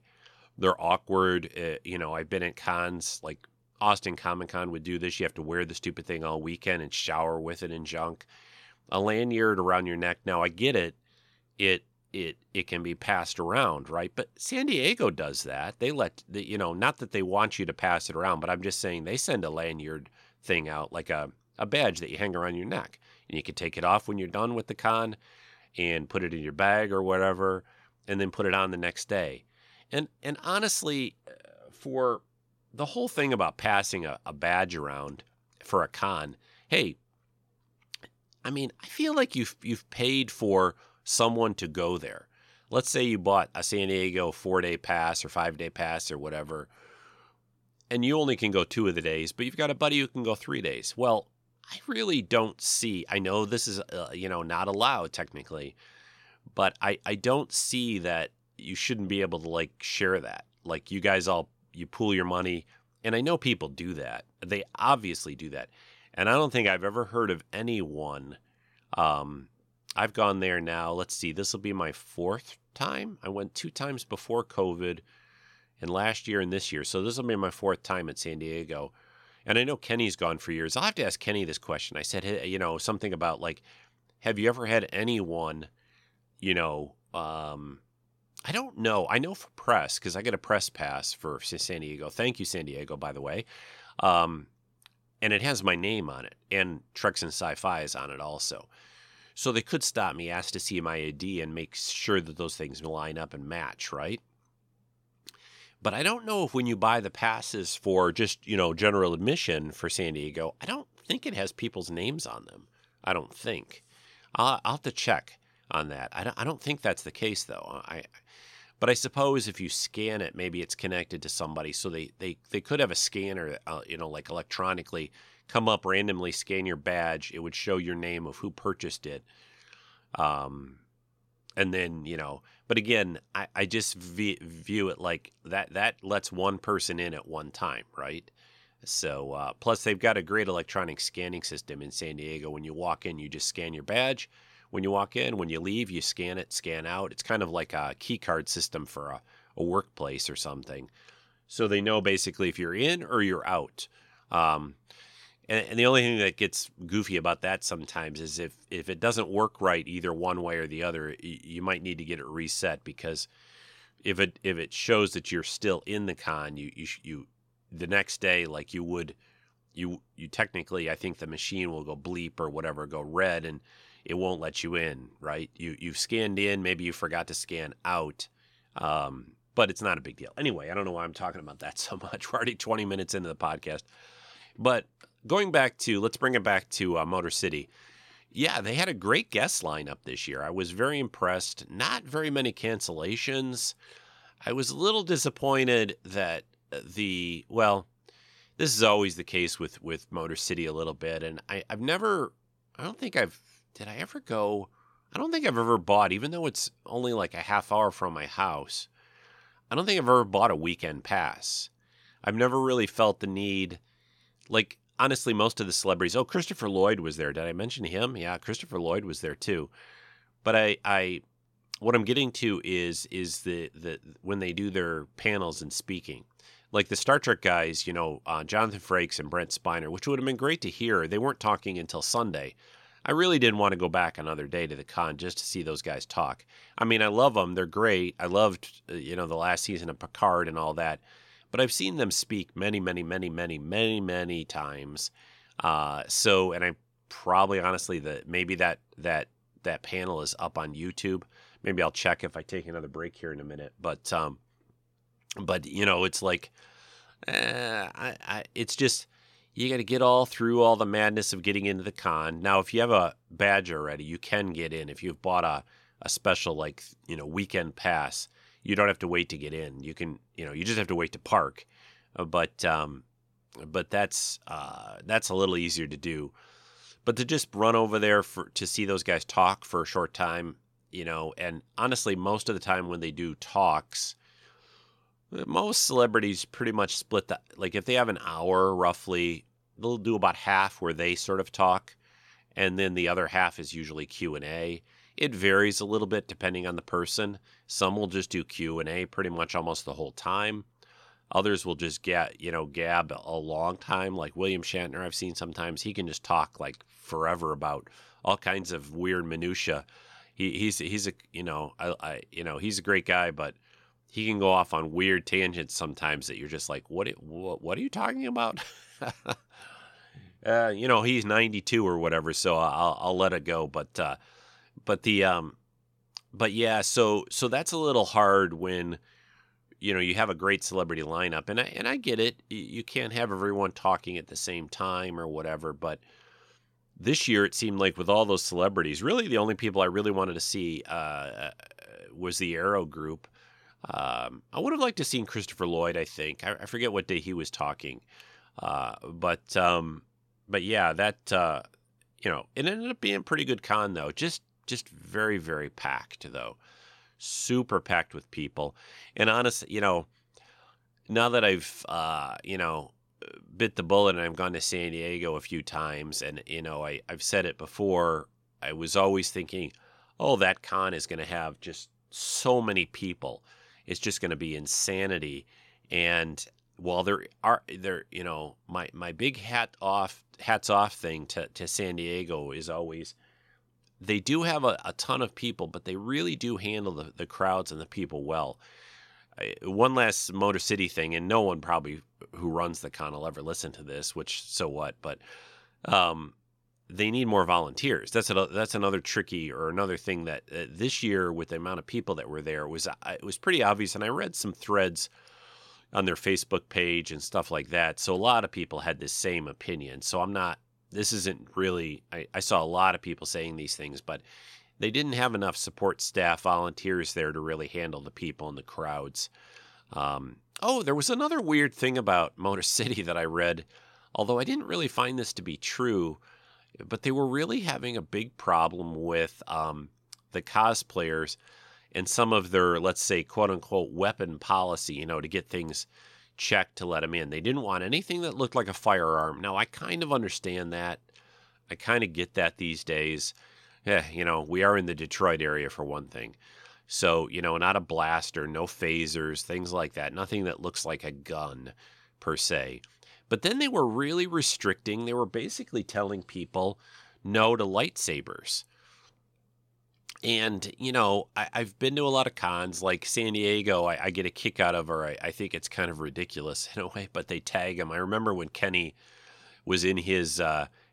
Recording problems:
none

